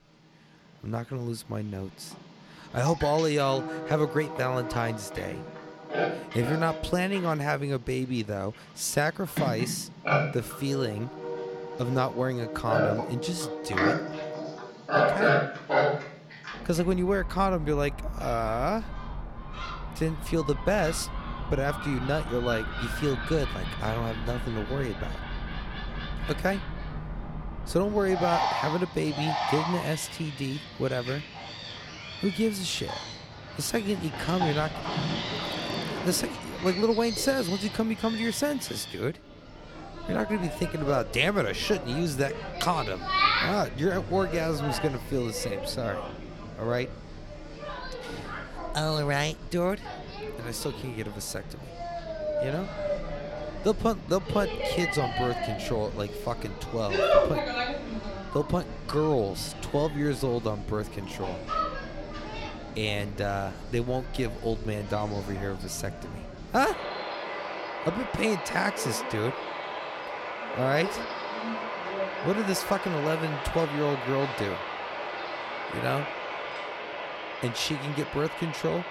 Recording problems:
animal sounds; loud; throughout; 4 dB below the speech

